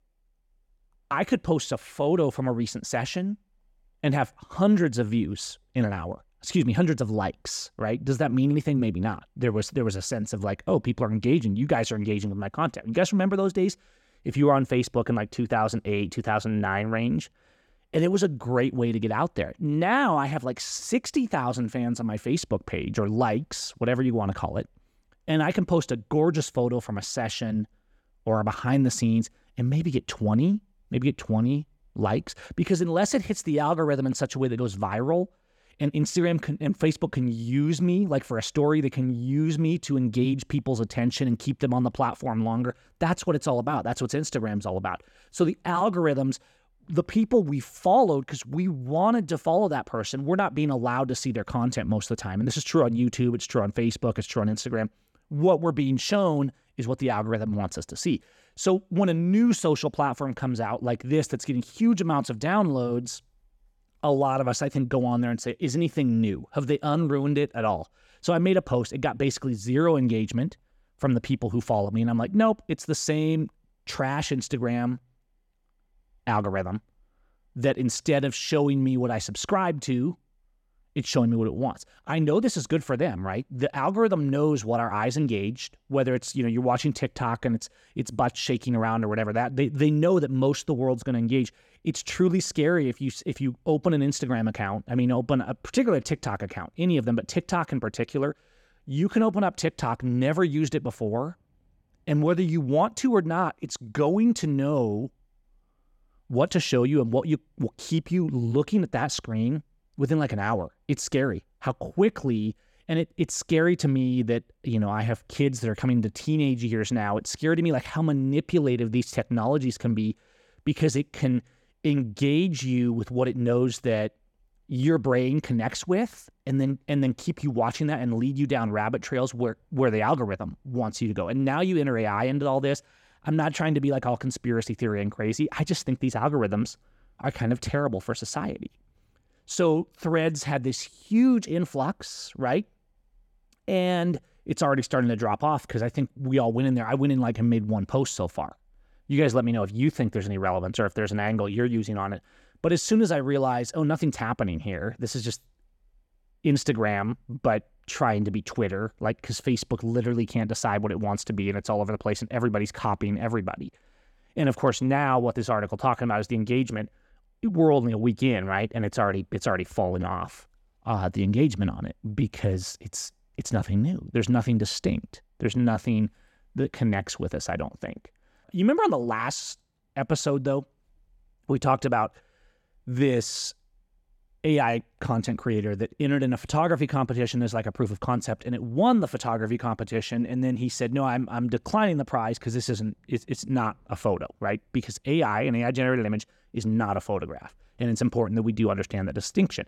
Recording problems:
none

